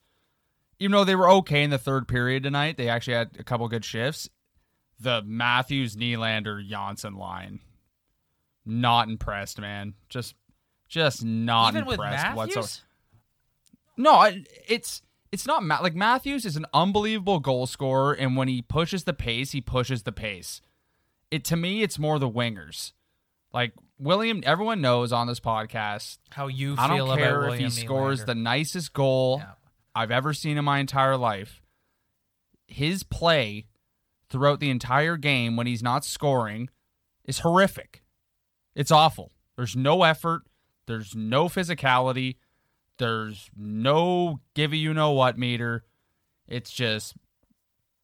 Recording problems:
none

